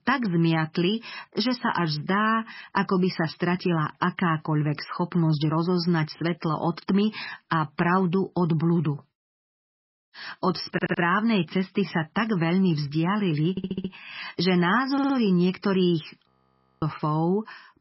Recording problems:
garbled, watery; badly; nothing above 5.5 kHz
audio stuttering; at 11 s, at 14 s and at 15 s
audio freezing; at 16 s for 0.5 s

